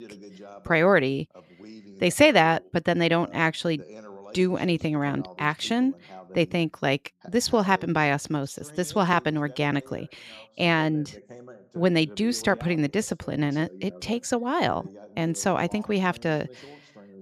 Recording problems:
voice in the background; faint; throughout; 20 dB below the speech

